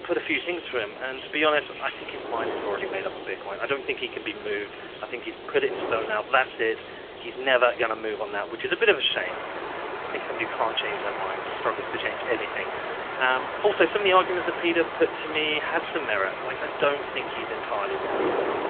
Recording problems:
phone-call audio; nothing above 3.5 kHz
rain or running water; loud; throughout; 8 dB below the speech
wind noise on the microphone; occasional gusts; 10 dB below the speech
hiss; noticeable; throughout; 20 dB below the speech

